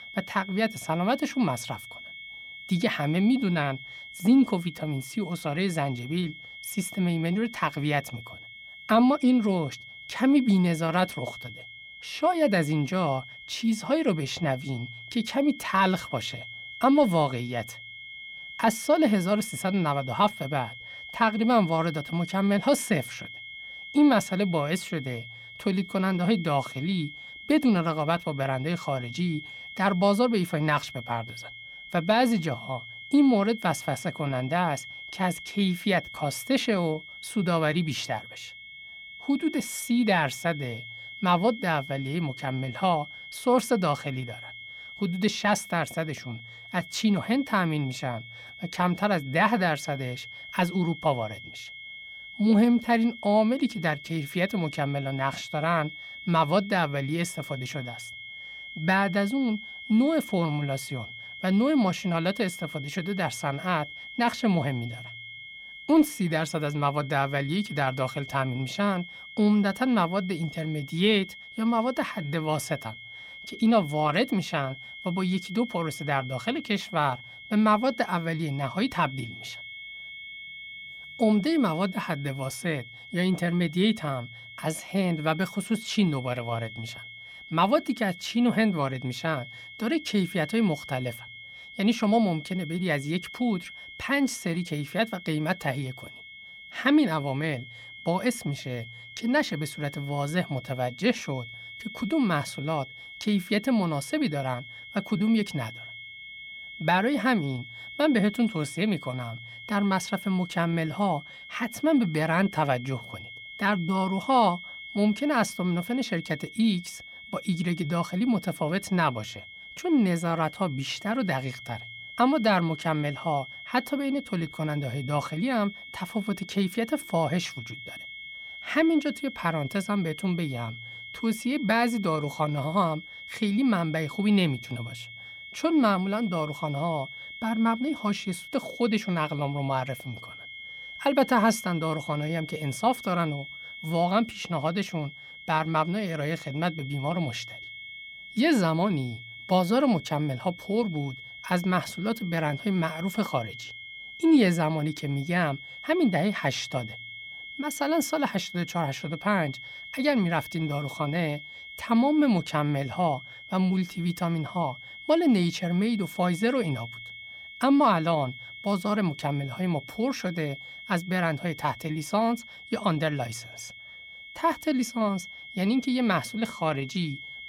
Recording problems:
high-pitched whine; noticeable; throughout; 2 kHz, 15 dB below the speech

